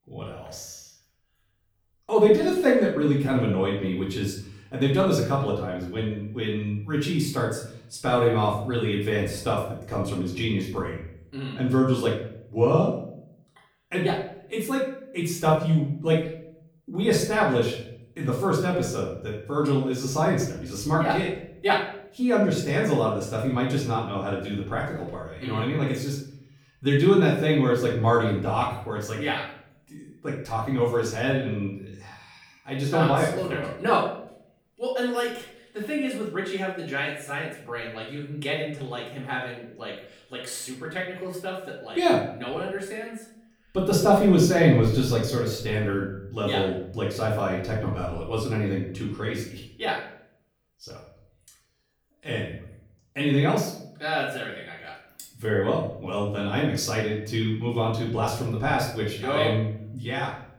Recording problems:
off-mic speech; far
room echo; noticeable; dies away in 0.5 s

